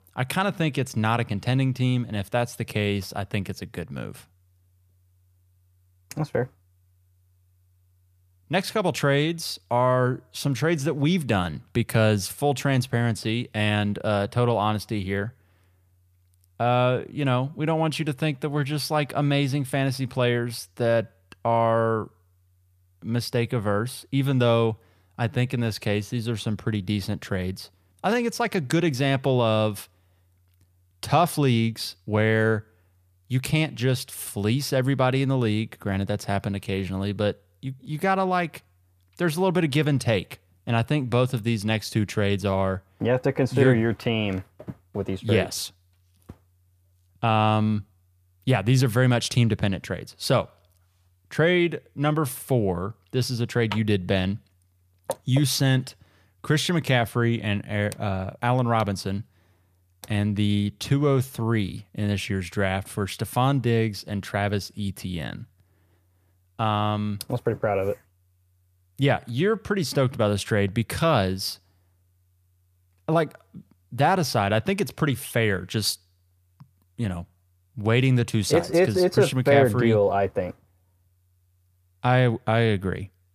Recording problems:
none

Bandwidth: 14.5 kHz